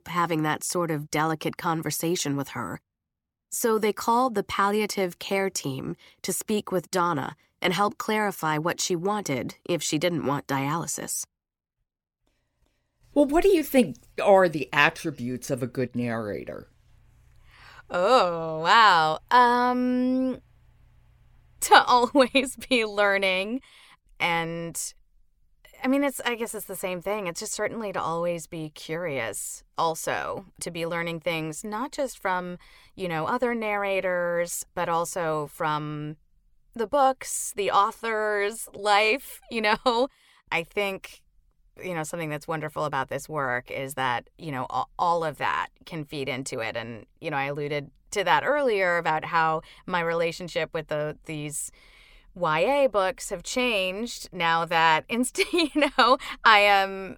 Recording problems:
none

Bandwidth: 17.5 kHz